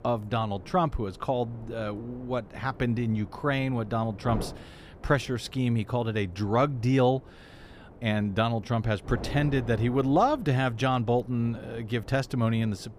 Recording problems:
wind noise on the microphone; occasional gusts; 20 dB below the speech

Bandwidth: 15 kHz